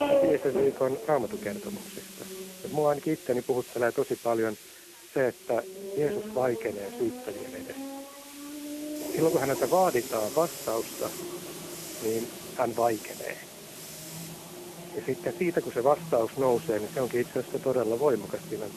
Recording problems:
phone-call audio; poor line
traffic noise; loud; throughout; 9 dB below the speech
hiss; noticeable; throughout; 15 dB below the speech

